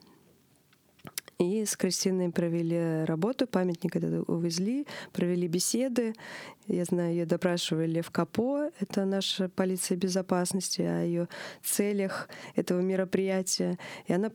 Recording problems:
squashed, flat; heavily

